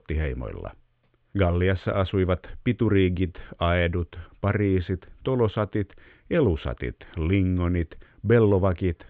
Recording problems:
muffled; very; fading above 3.5 kHz

